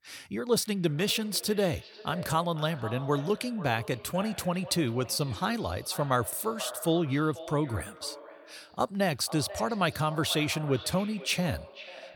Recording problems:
echo of what is said; noticeable; throughout; 490 ms later, 15 dB below the speech

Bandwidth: 18 kHz